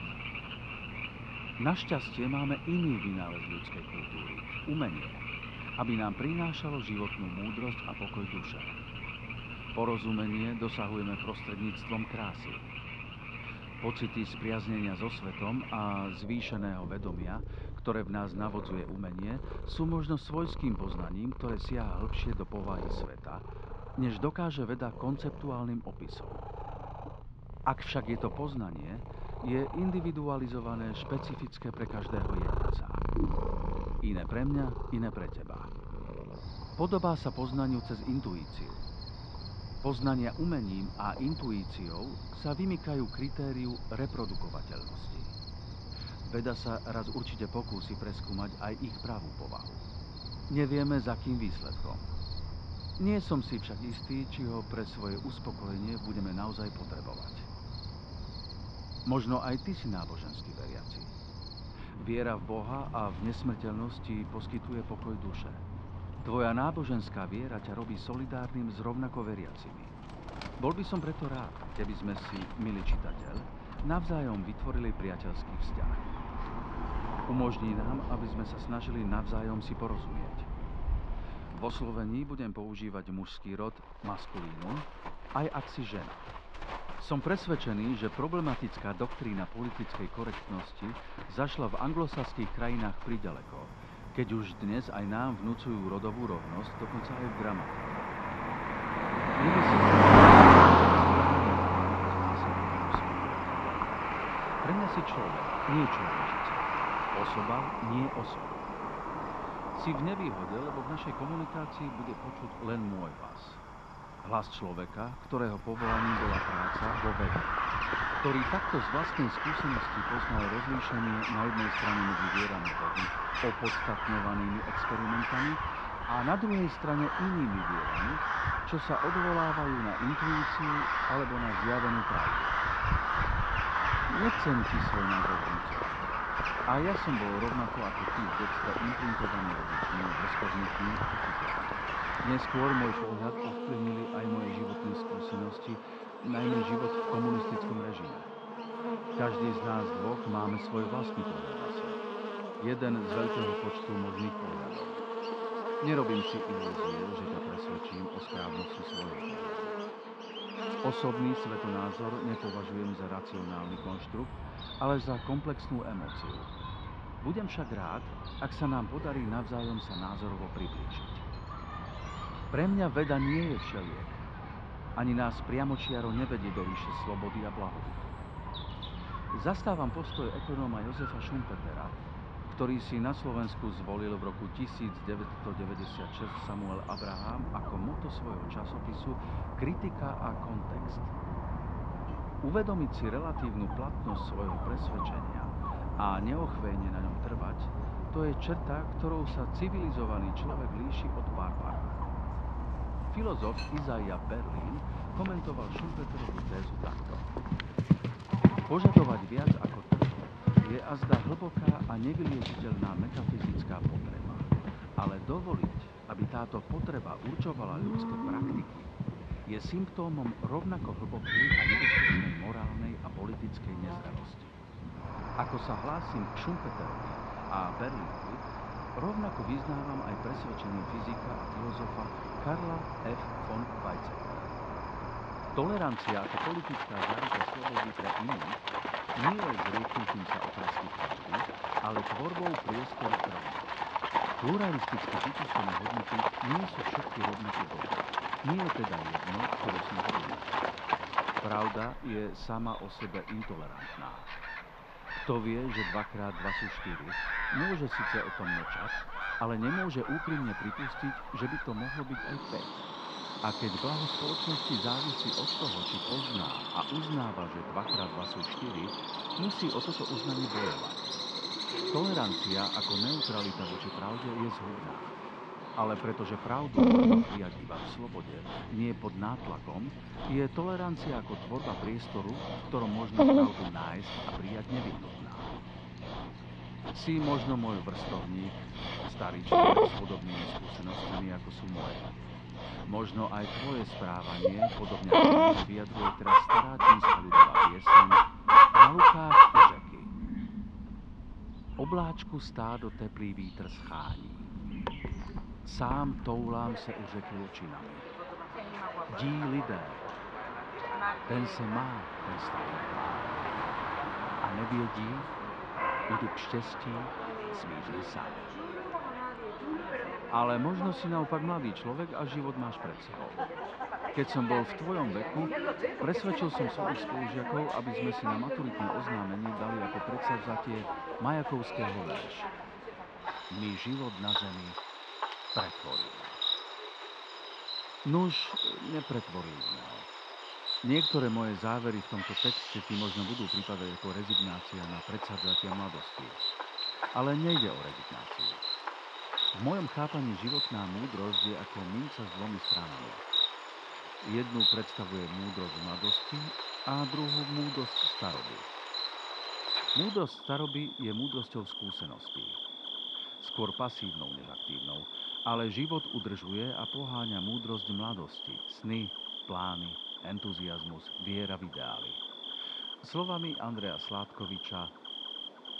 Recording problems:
muffled; slightly; fading above 4 kHz
animal sounds; very loud; throughout; 5 dB above the speech

